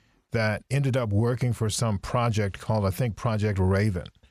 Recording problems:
none

